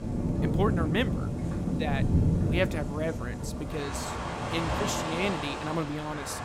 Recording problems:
rain or running water; very loud; throughout; 2 dB above the speech

